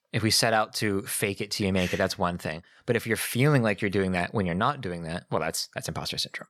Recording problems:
none

